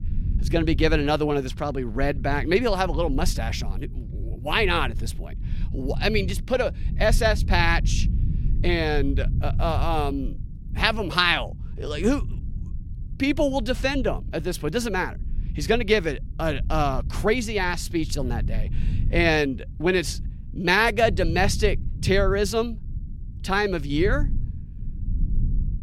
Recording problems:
low rumble; faint; throughout; 20 dB below the speech

